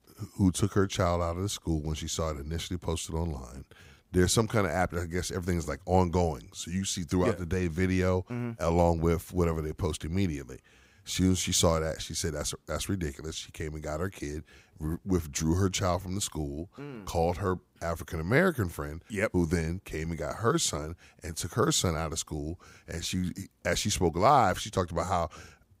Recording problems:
none

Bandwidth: 15.5 kHz